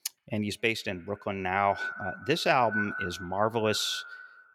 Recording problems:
echo of what is said; strong; throughout; 120 ms later, 8 dB below the speech

